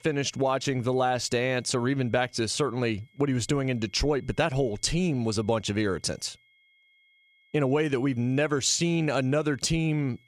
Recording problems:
high-pitched whine; faint; throughout; 2 kHz, 35 dB below the speech

